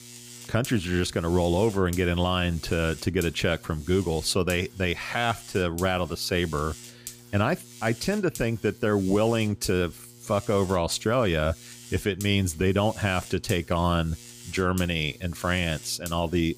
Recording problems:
electrical hum; noticeable; throughout; 60 Hz, 20 dB below the speech

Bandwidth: 15 kHz